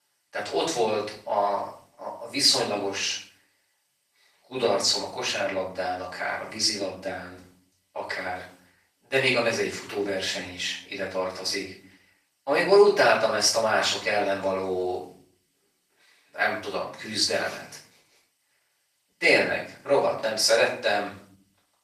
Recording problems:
off-mic speech; far
thin; very; fading below 650 Hz
room echo; noticeable; dies away in 0.5 s
garbled, watery; slightly; nothing above 14.5 kHz

